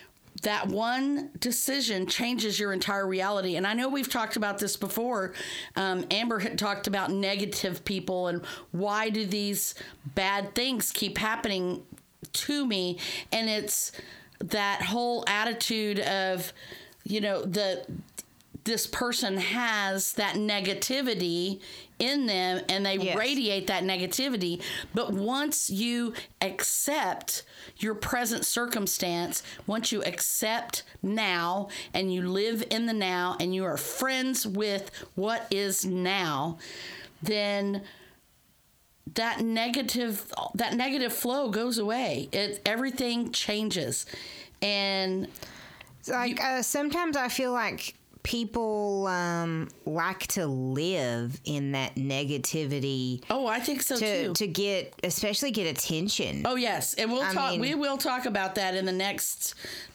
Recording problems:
squashed, flat; heavily

